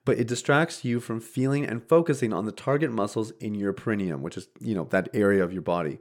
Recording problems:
none

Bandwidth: 17 kHz